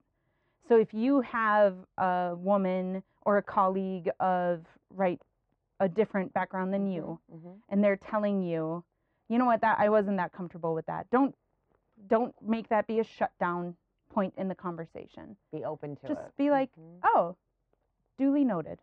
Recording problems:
muffled; very; fading above 1.5 kHz

